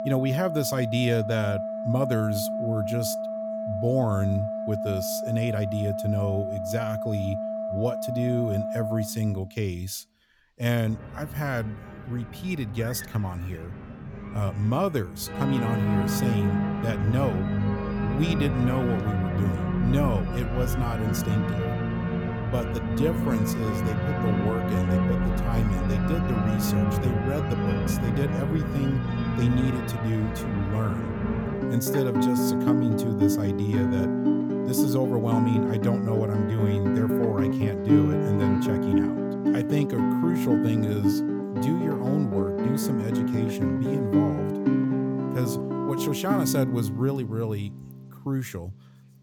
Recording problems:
background music; very loud; throughout; 2 dB above the speech

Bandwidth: 18.5 kHz